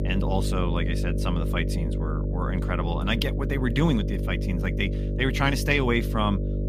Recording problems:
electrical hum; loud; throughout; 50 Hz, 8 dB below the speech

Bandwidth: 15 kHz